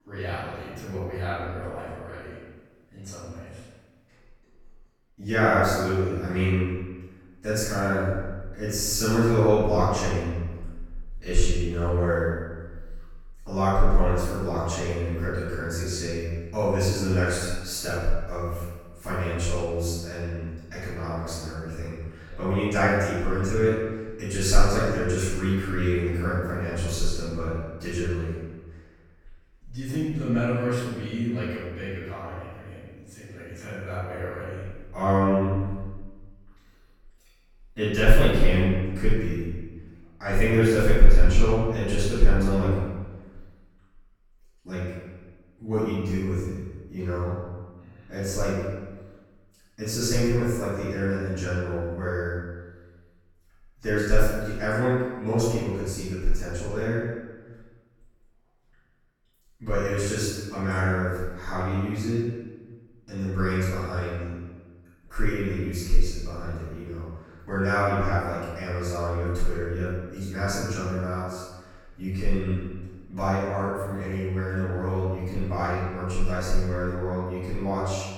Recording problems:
room echo; strong; dies away in 1.2 s
off-mic speech; far

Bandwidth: 17.5 kHz